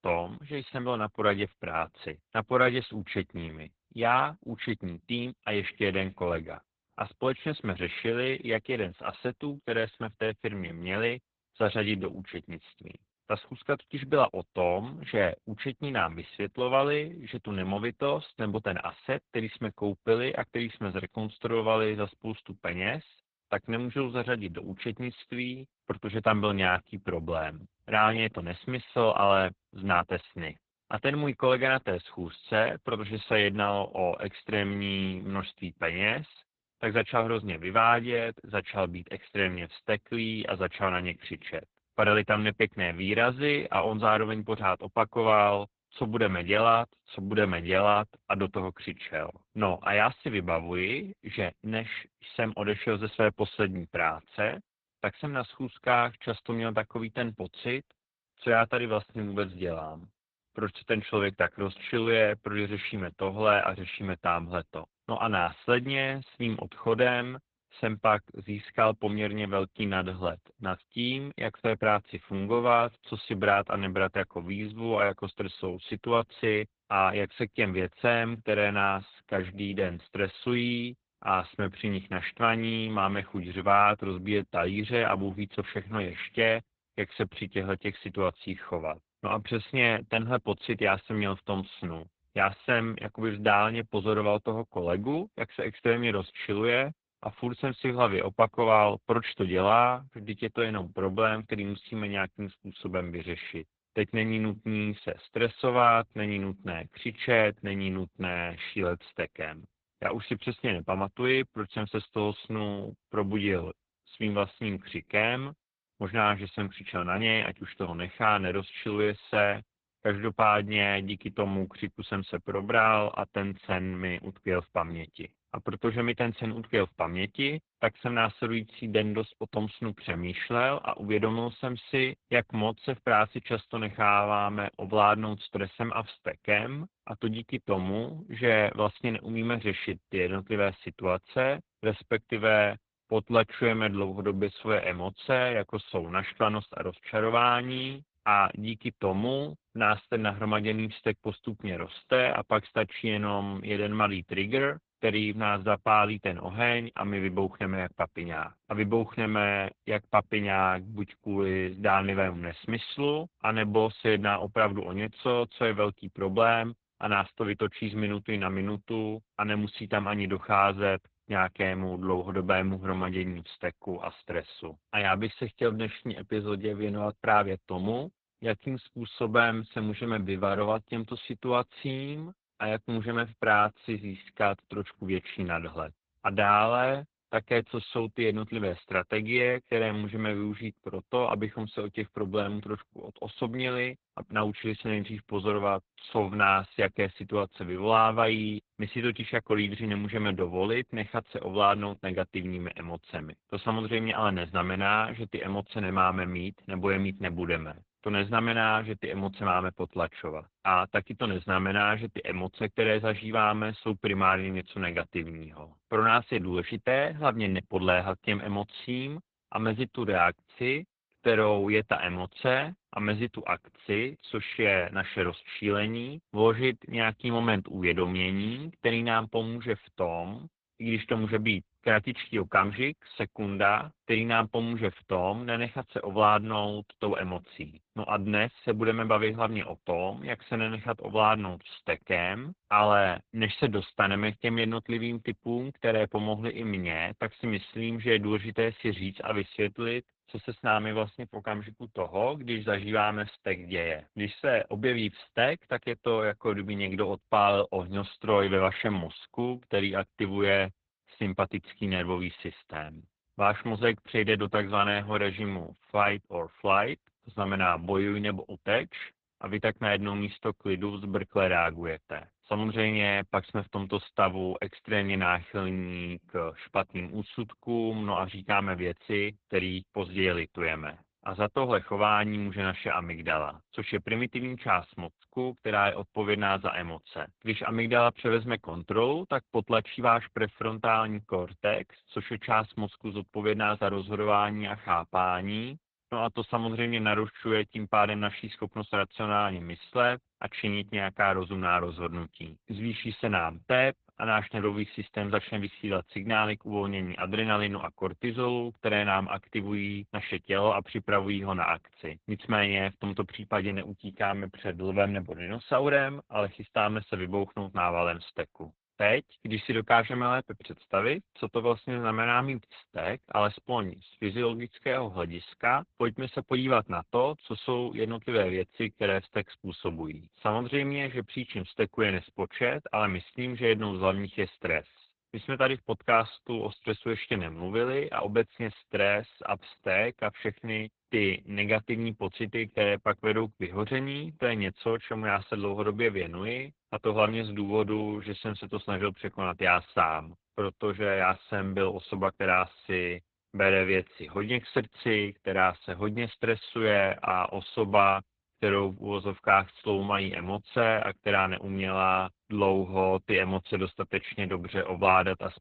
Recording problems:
garbled, watery; badly; nothing above 3.5 kHz

